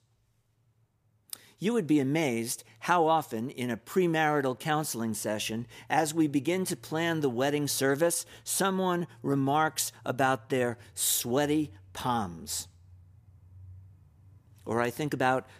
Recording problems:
none

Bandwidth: 15 kHz